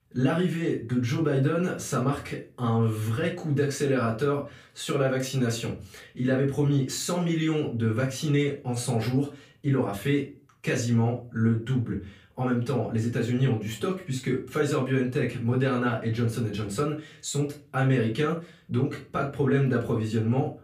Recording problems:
off-mic speech; far
room echo; slight; dies away in 0.3 s

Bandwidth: 15 kHz